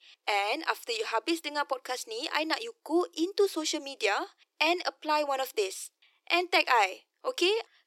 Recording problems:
thin; very; fading below 350 Hz

